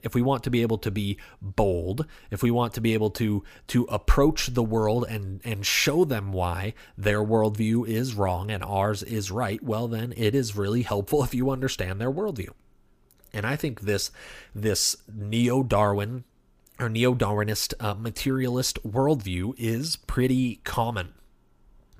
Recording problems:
none

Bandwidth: 15 kHz